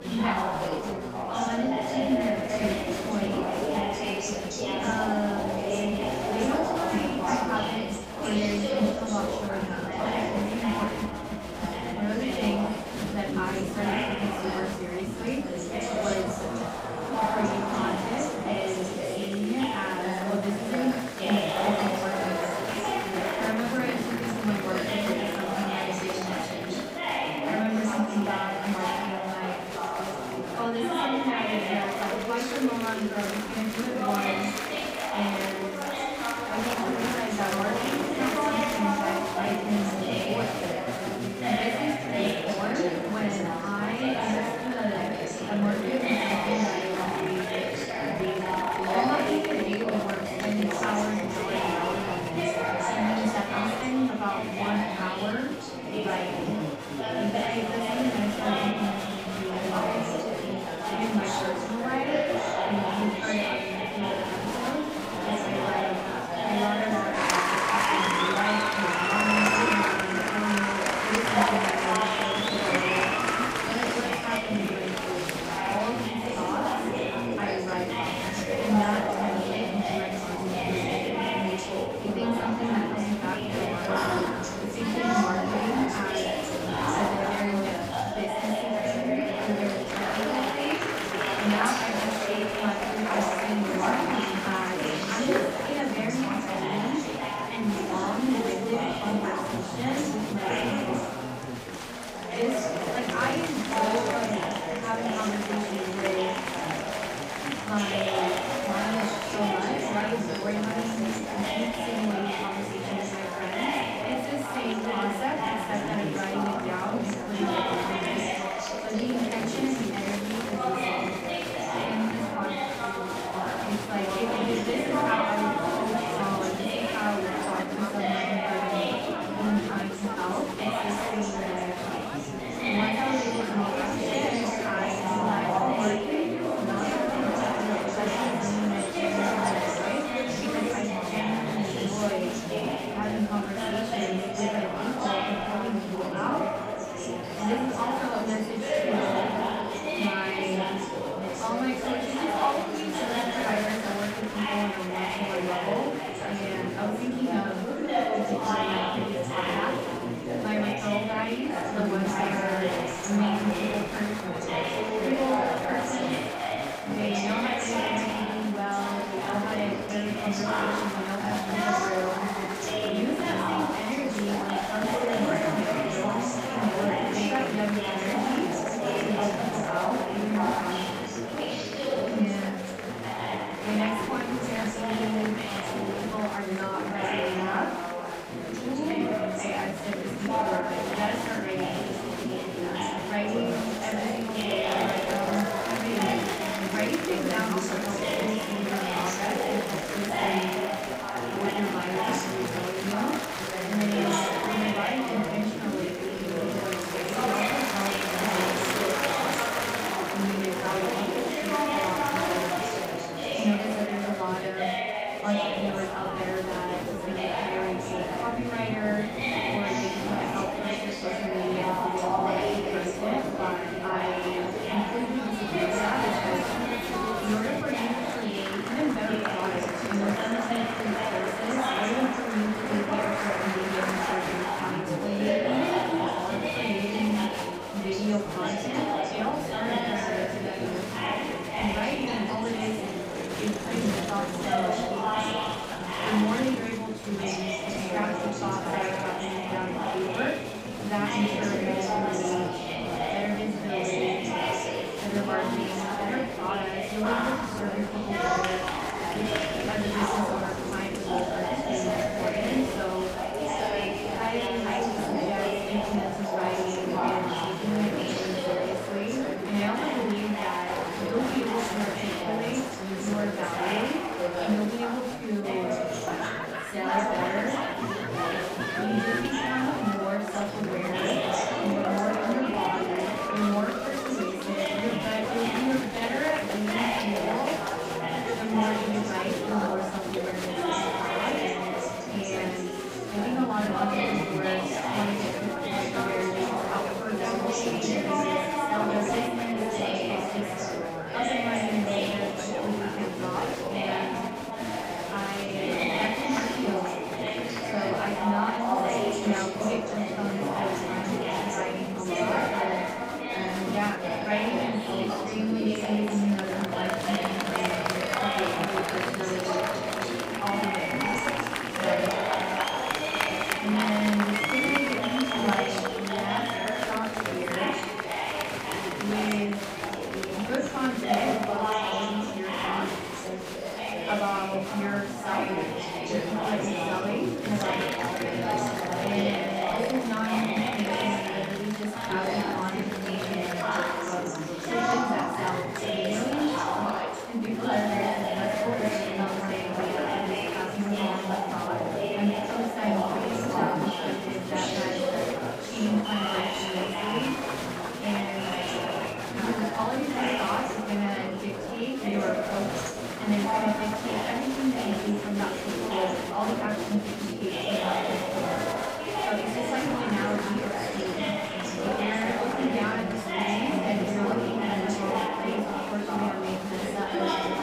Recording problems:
off-mic speech; far
room echo; noticeable; dies away in 0.4 s
chatter from many people; very loud; throughout; 2 dB above the speech
background music; faint; throughout; 25 dB below the speech

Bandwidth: 15.5 kHz